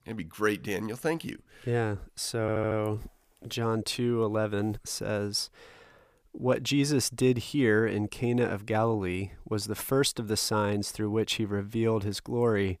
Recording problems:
audio stuttering; at 2.5 s

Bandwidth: 15 kHz